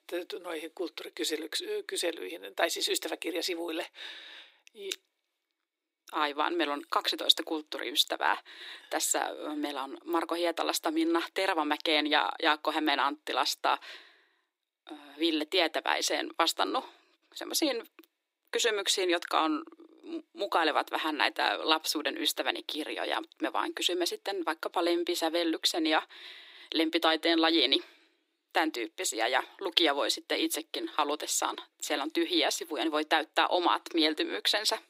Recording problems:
thin; somewhat; fading below 300 Hz

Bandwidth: 15.5 kHz